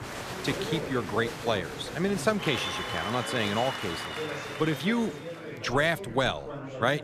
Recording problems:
crowd noise; loud; until 5 s; 6 dB below the speech
chatter from many people; loud; throughout; 10 dB below the speech

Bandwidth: 14.5 kHz